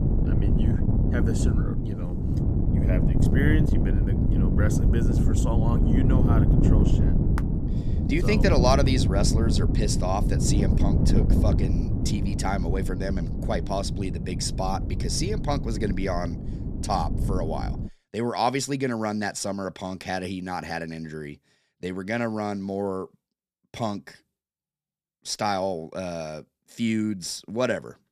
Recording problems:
wind noise on the microphone; heavy; until 18 s; 4 dB below the speech

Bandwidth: 14.5 kHz